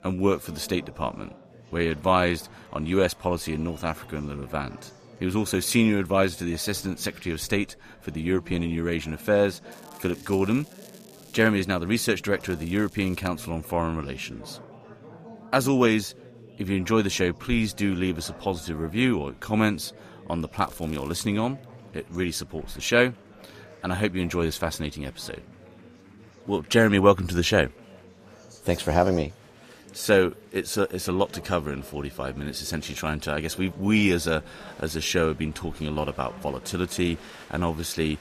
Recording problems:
chatter from many people; faint; throughout; 20 dB below the speech
crackling; faint; from 9.5 to 11 s, at 12 s and at 21 s; 25 dB below the speech

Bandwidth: 14.5 kHz